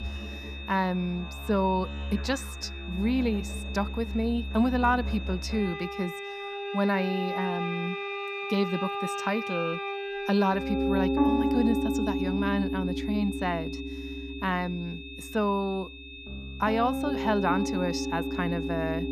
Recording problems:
background music; loud; throughout; 3 dB below the speech
high-pitched whine; noticeable; throughout; 2.5 kHz, 15 dB below the speech

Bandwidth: 14.5 kHz